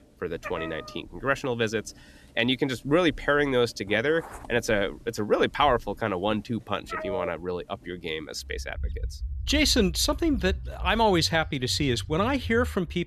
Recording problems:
animal sounds; noticeable; throughout; 10 dB below the speech

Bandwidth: 13.5 kHz